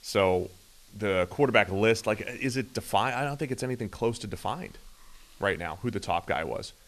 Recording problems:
hiss; faint; throughout; 25 dB below the speech

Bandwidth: 13.5 kHz